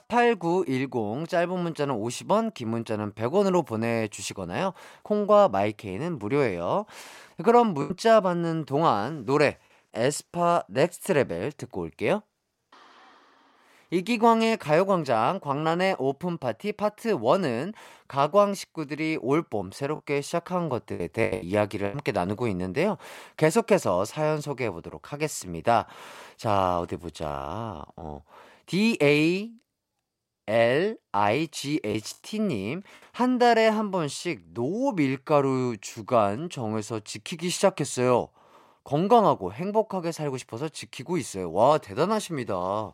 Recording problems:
choppy; occasionally; at 8 s and from 21 to 22 s; 5% of the speech affected

